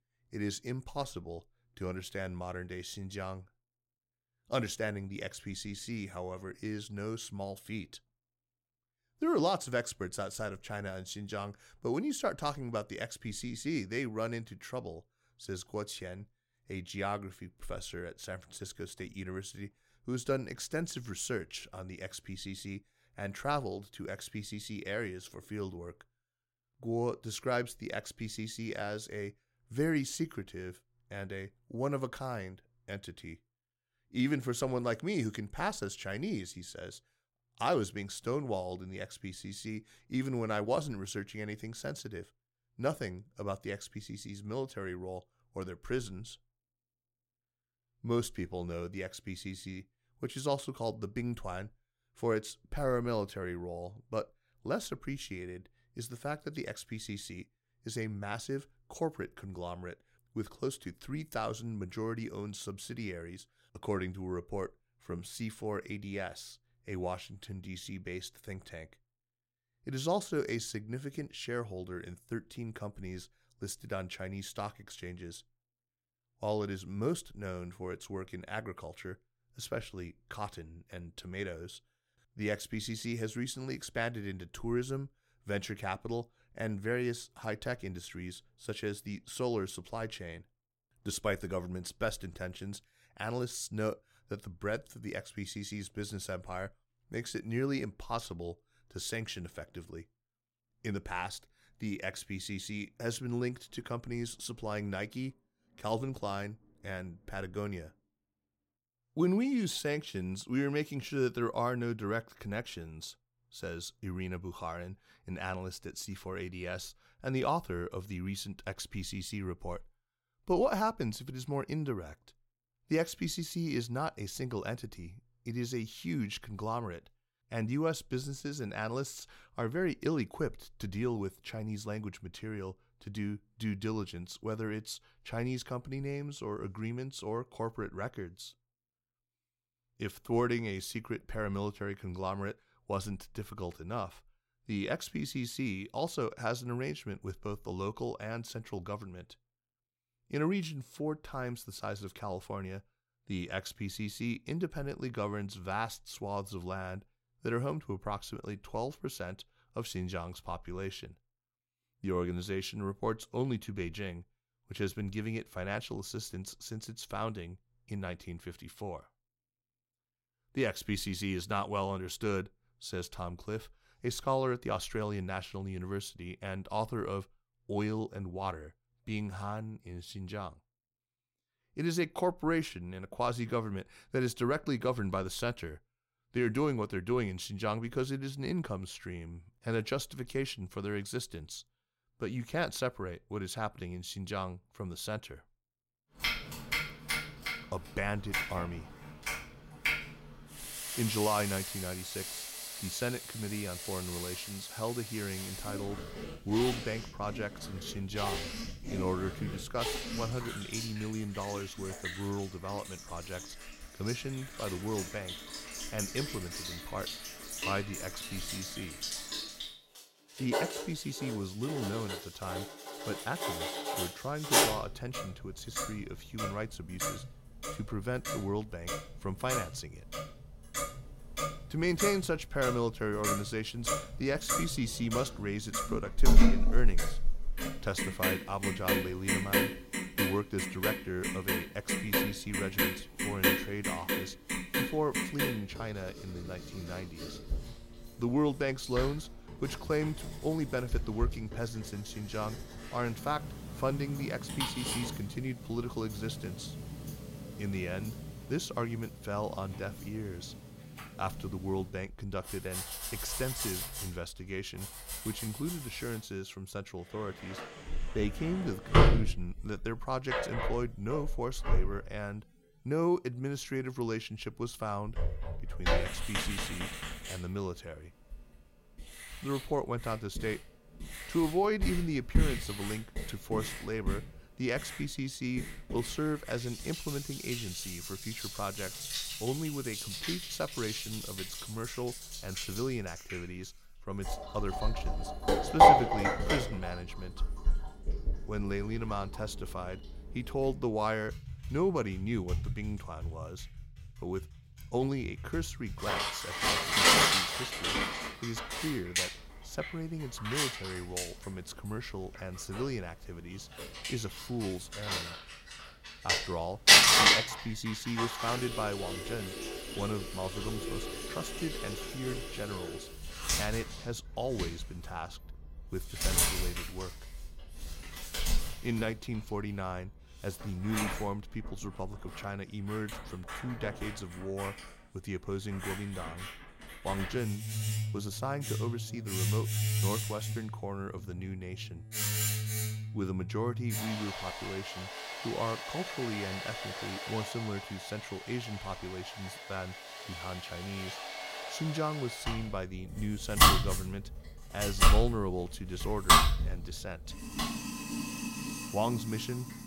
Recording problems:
household noises; very loud; from 3:16 on; 4 dB above the speech

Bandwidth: 16 kHz